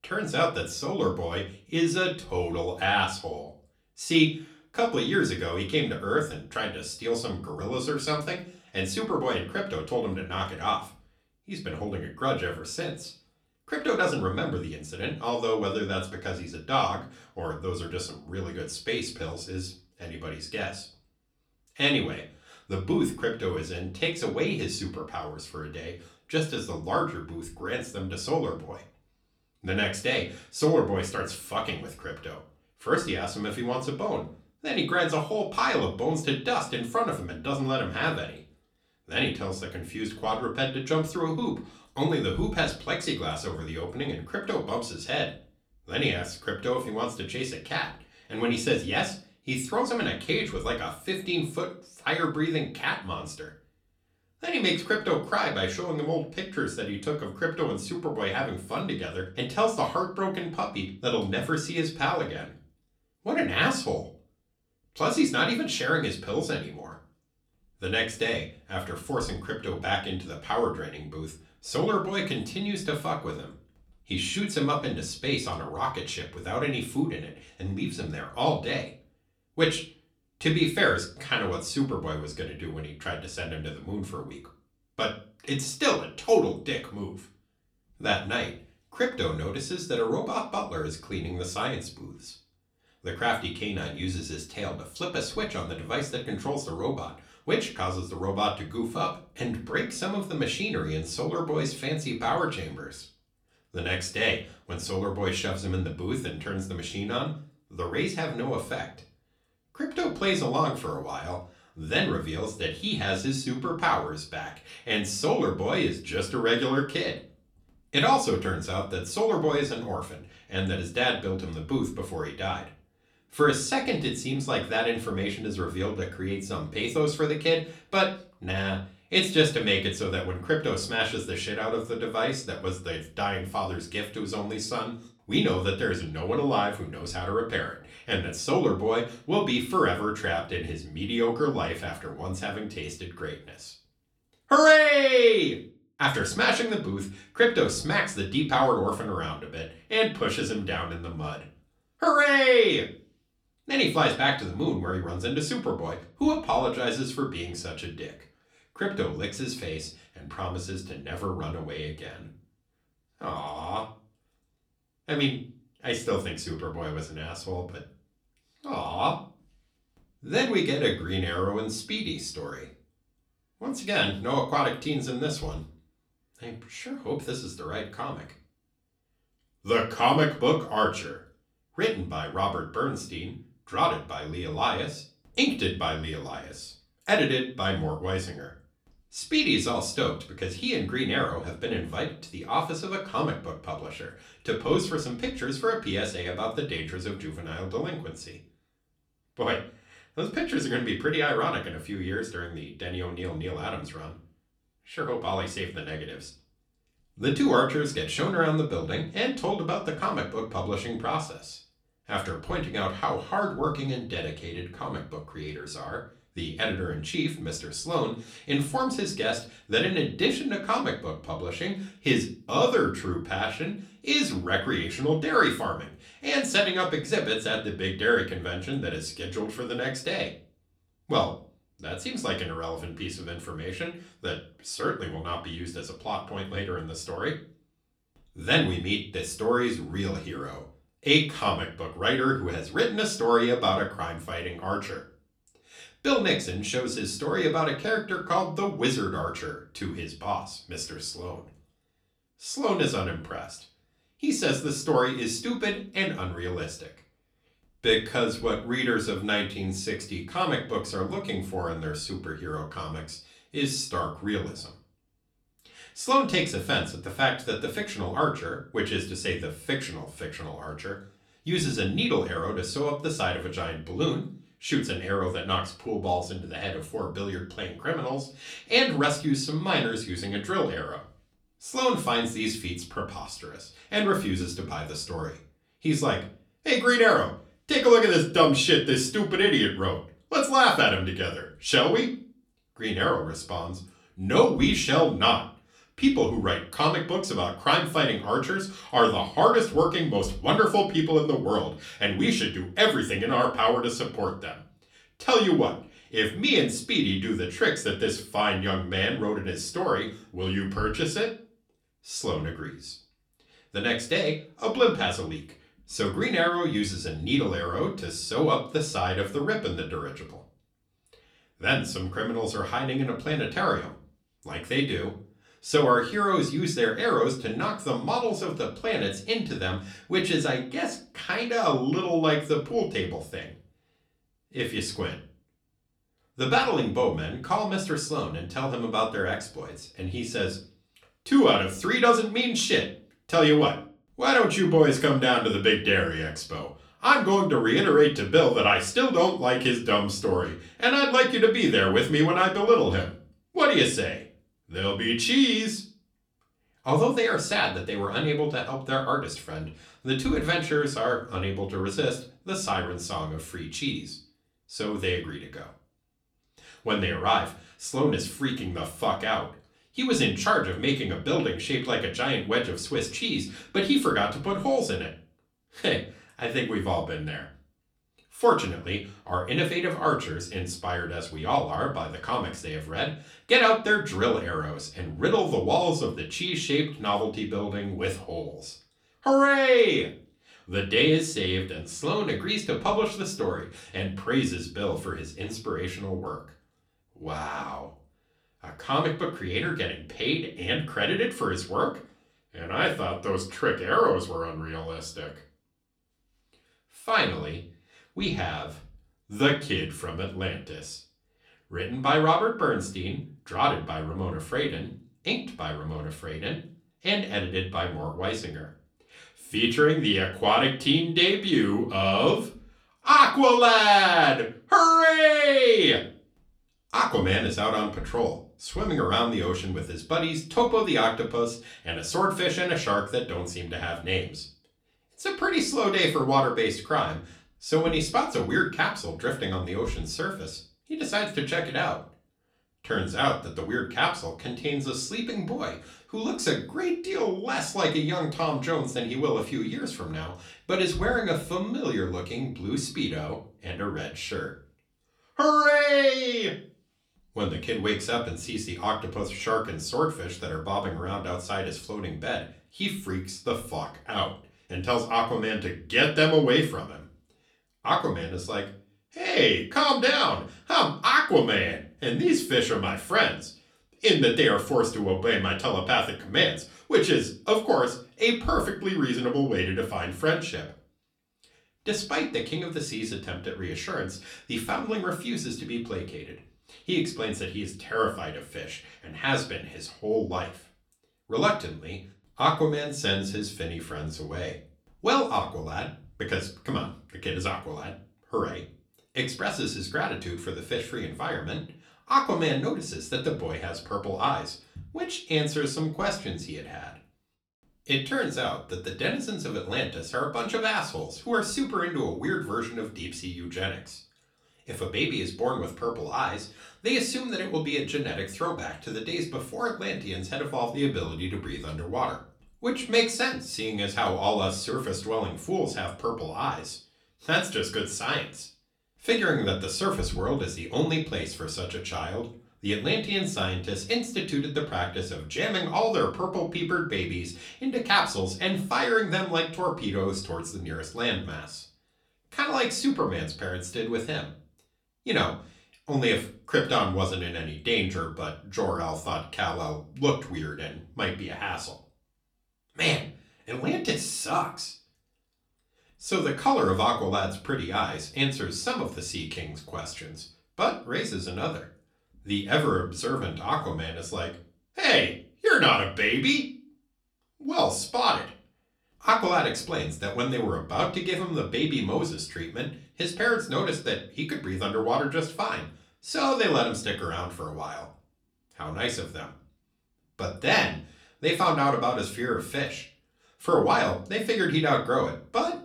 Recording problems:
off-mic speech; far
room echo; very slight; dies away in 0.3 s

